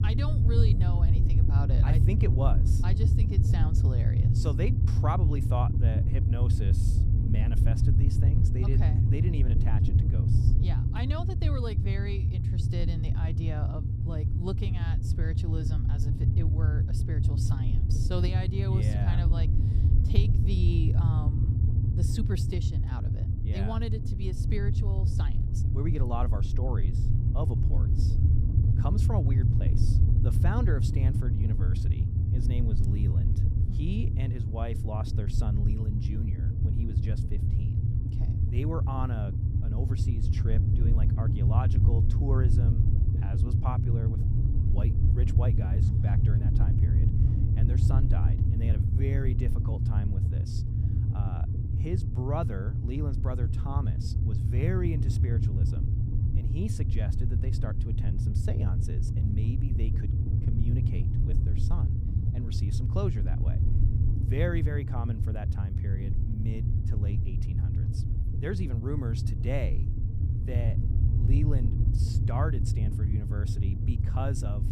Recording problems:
low rumble; loud; throughout; as loud as the speech

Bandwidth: 15 kHz